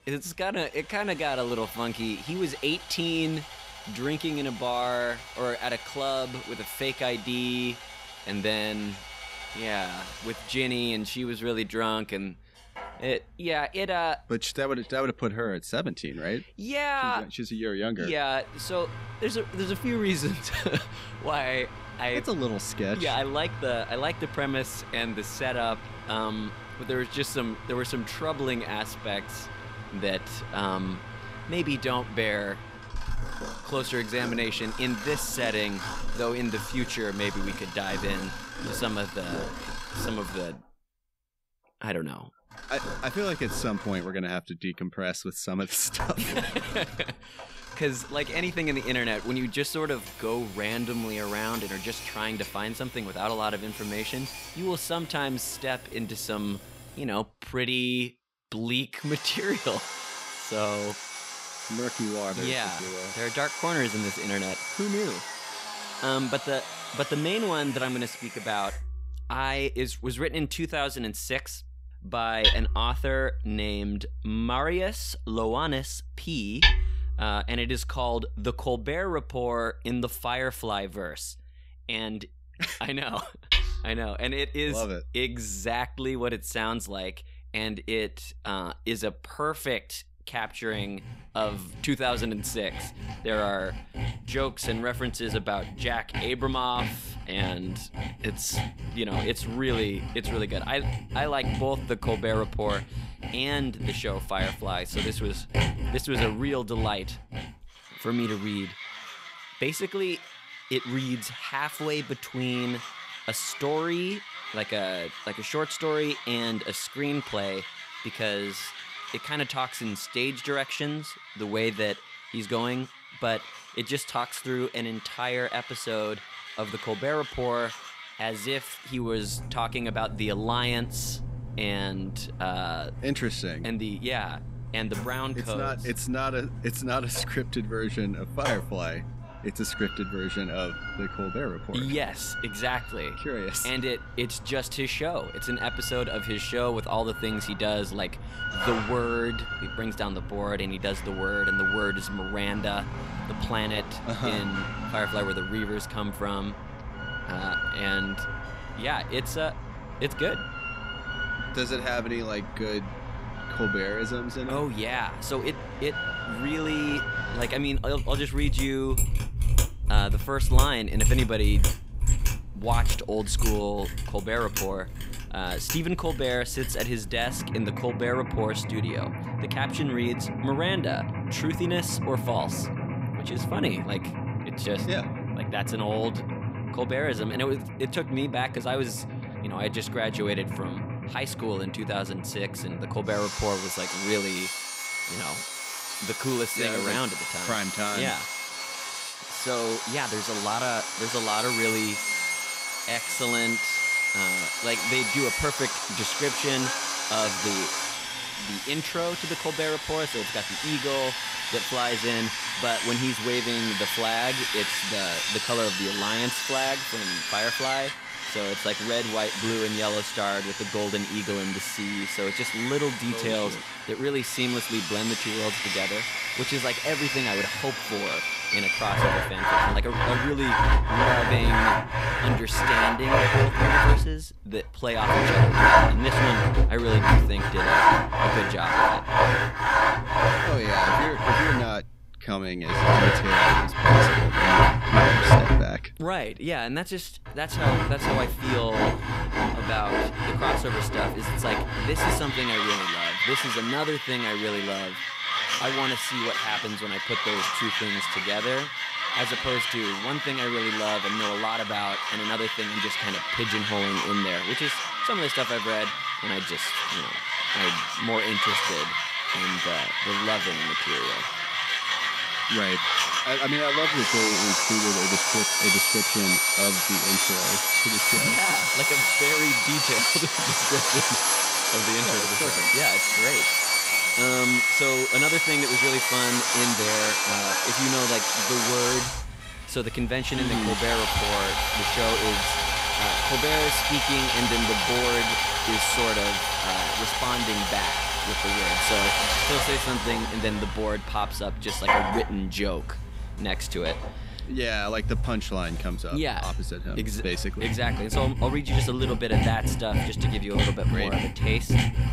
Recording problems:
machinery noise; very loud; throughout; 4 dB above the speech

